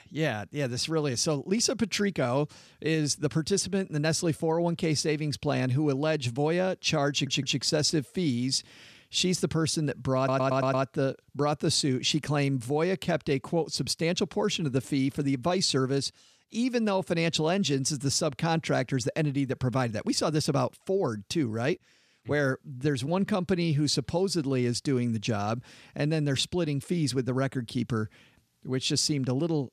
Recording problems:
audio stuttering; at 7 s and at 10 s

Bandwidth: 14 kHz